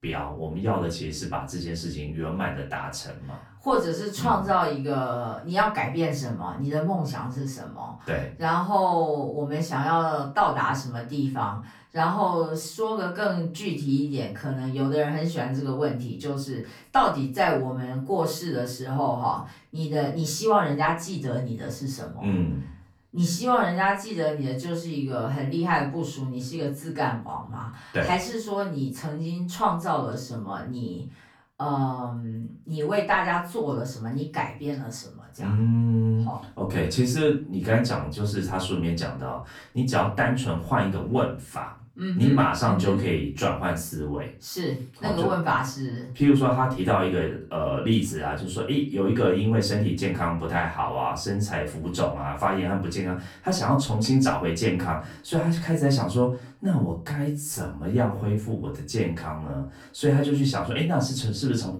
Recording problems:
off-mic speech; far
room echo; slight; dies away in 0.3 s

